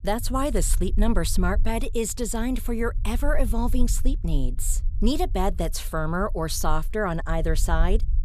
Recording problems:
low rumble; faint; throughout; 25 dB below the speech

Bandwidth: 14.5 kHz